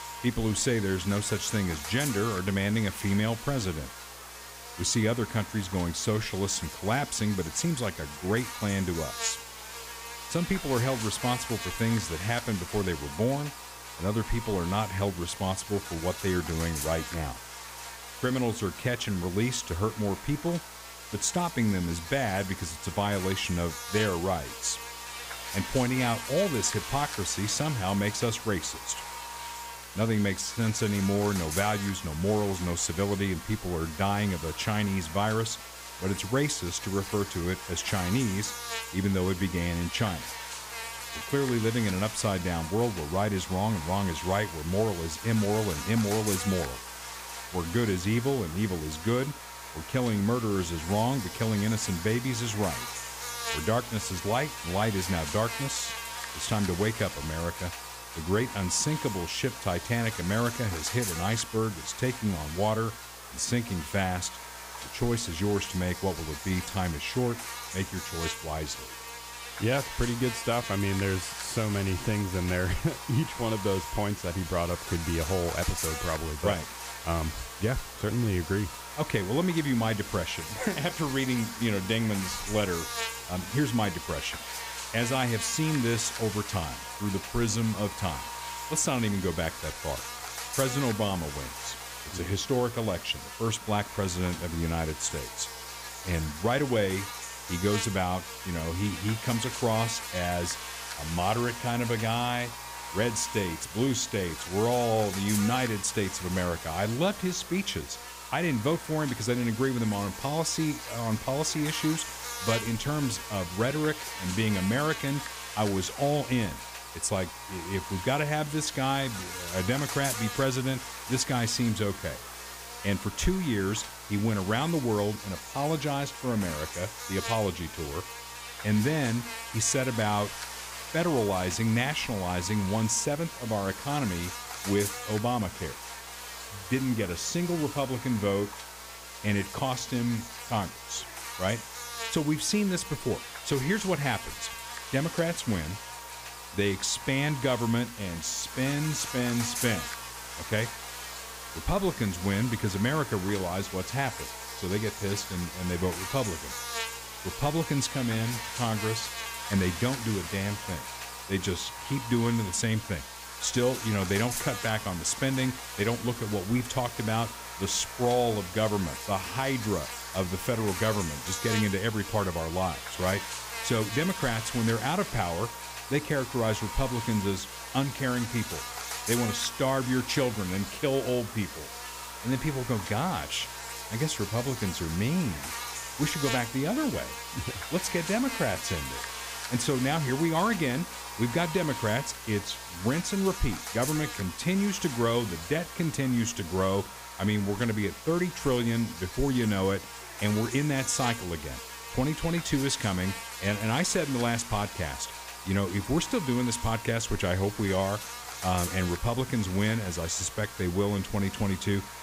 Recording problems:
electrical hum; loud; throughout; 60 Hz, 6 dB below the speech

